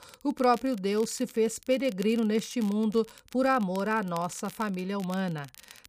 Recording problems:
crackle, like an old record; faint; 20 dB below the speech

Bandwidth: 15 kHz